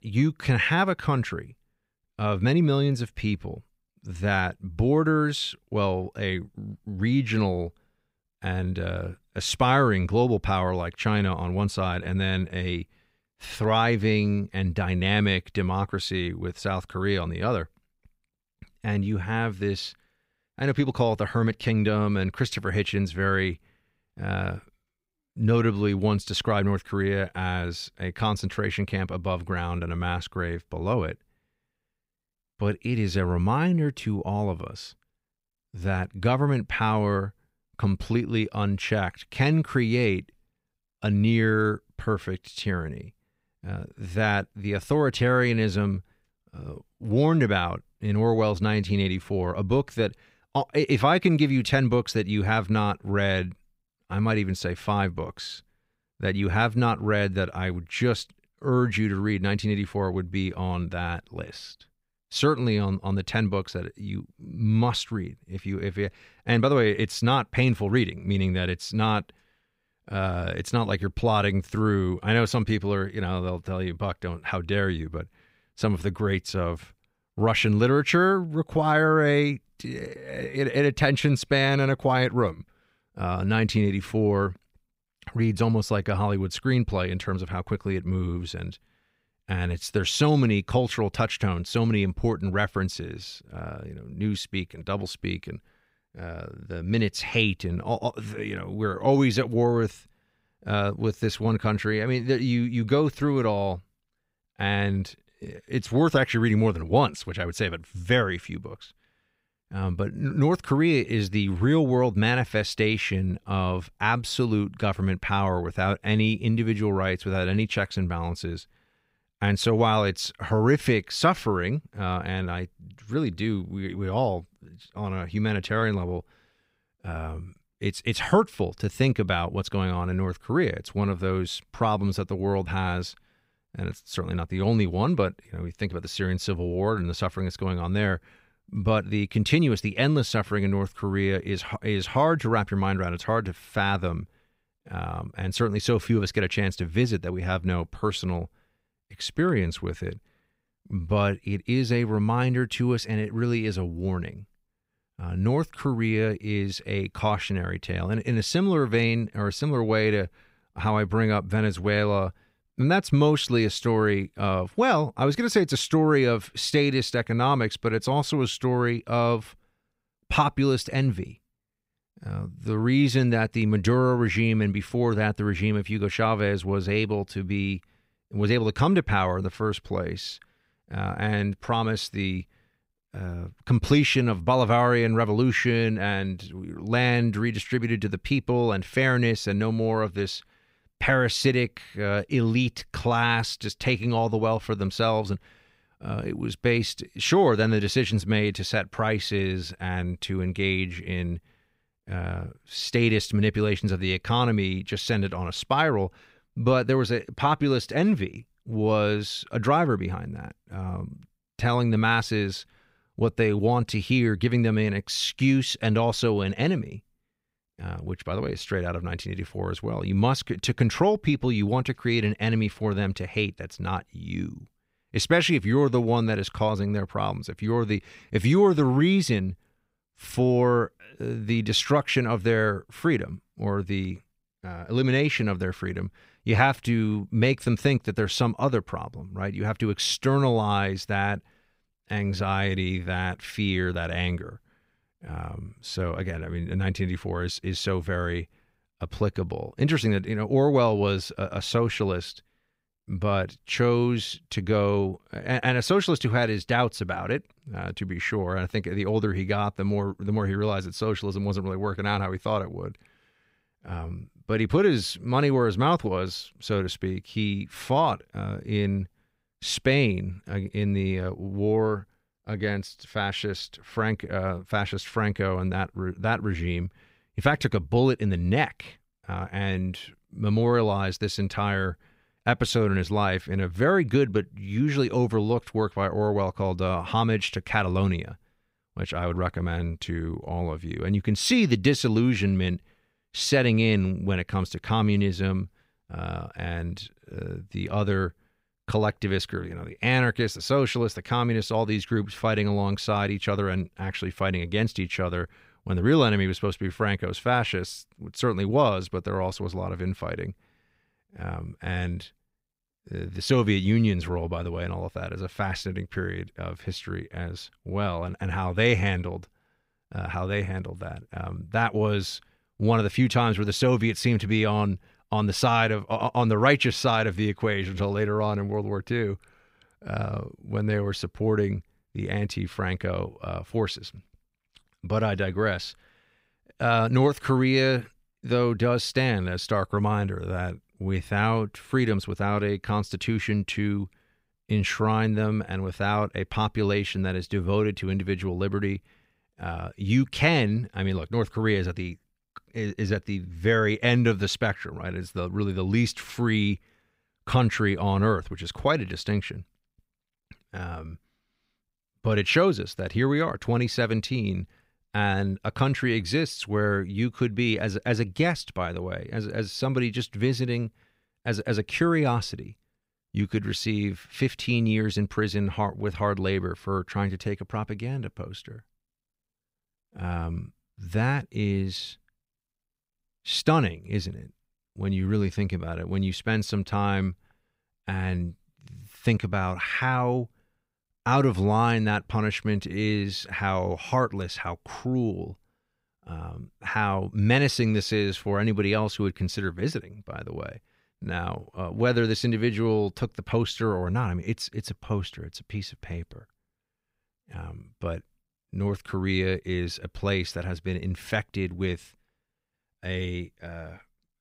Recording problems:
none

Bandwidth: 15.5 kHz